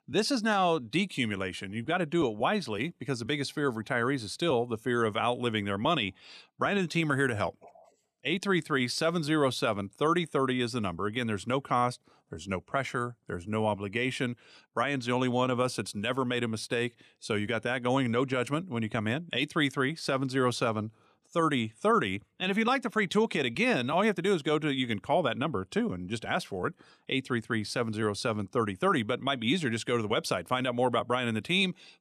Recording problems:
none

